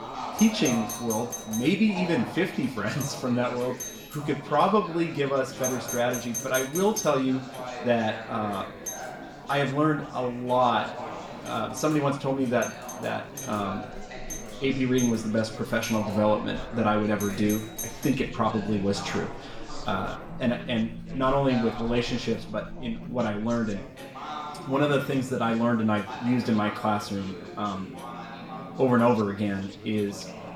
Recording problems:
room echo; slight; dies away in 0.4 s
off-mic speech; somewhat distant
alarms or sirens; noticeable; throughout; 10 dB below the speech
chatter from many people; noticeable; throughout; 15 dB below the speech
household noises; faint; throughout; 25 dB below the speech

